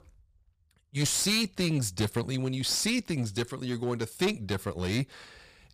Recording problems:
distortion; slight; 7% of the sound clipped

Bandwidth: 15 kHz